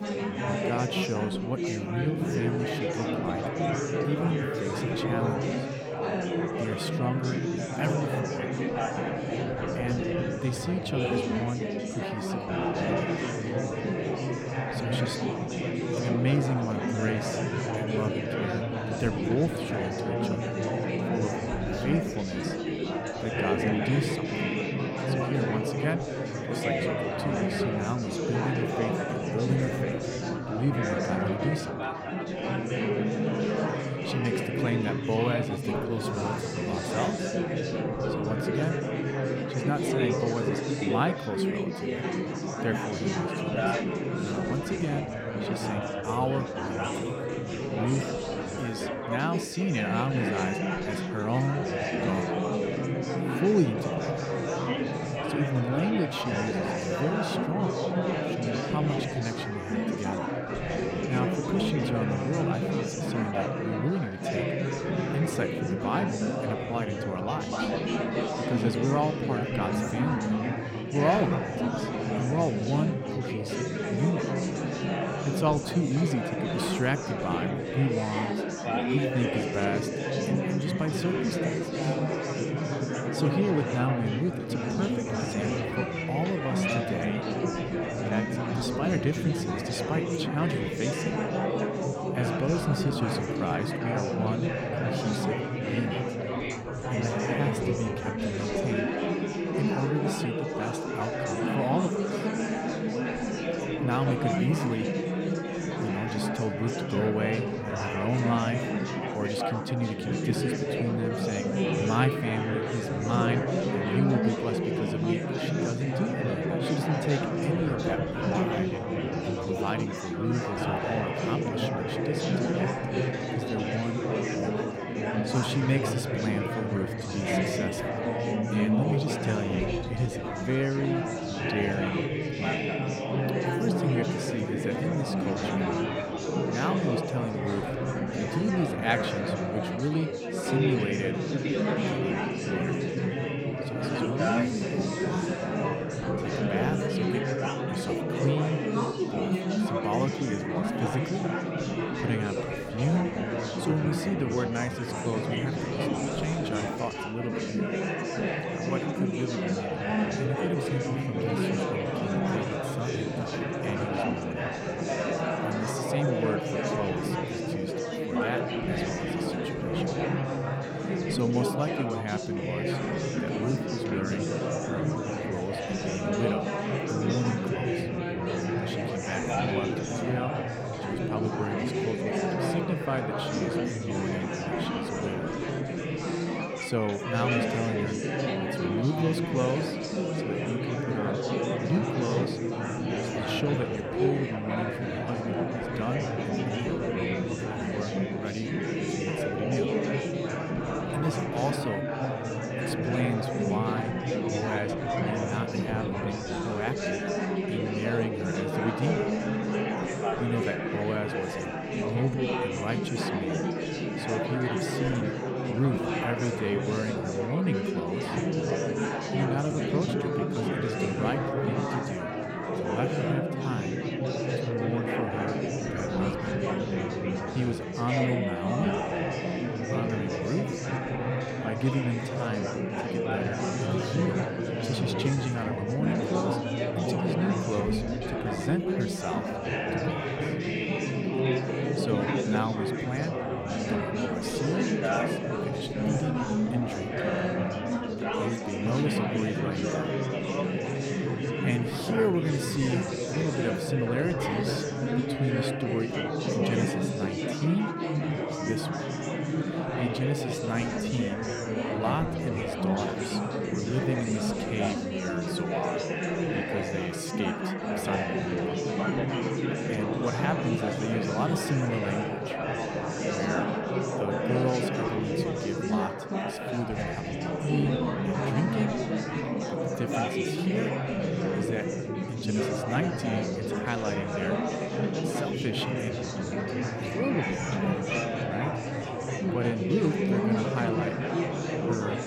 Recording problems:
chatter from many people; very loud; throughout; 3 dB above the speech

